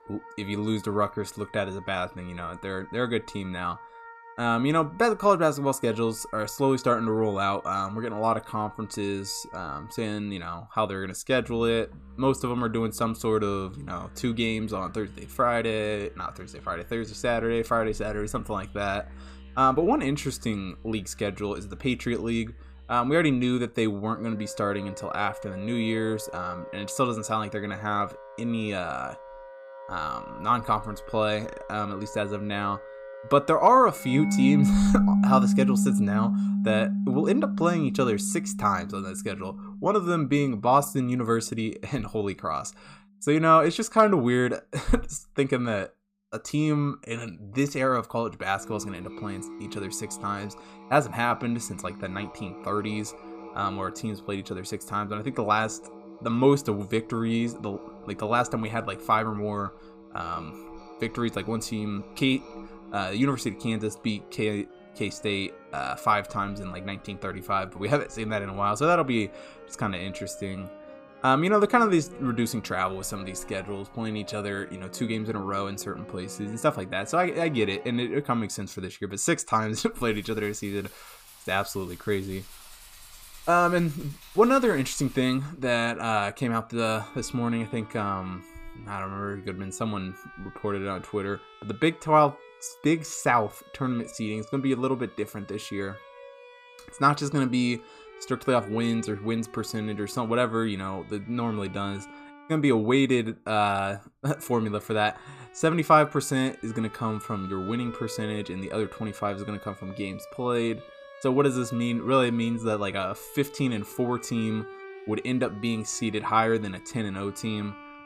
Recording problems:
background music; loud; throughout; 9 dB below the speech

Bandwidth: 15 kHz